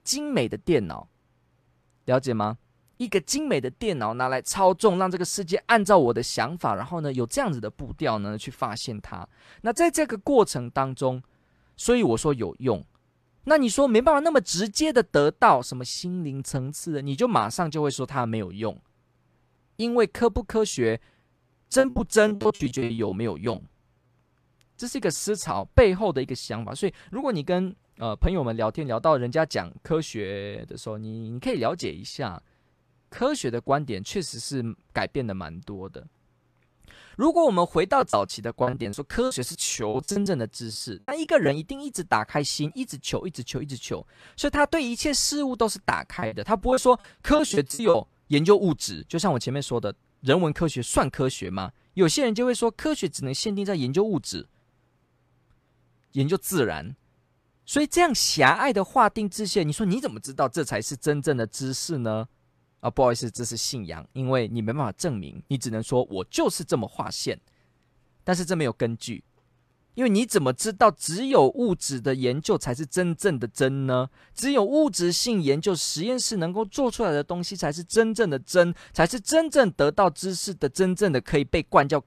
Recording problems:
choppy; very; from 22 to 24 s, from 38 to 42 s and from 46 to 48 s; 21% of the speech affected

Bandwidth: 14 kHz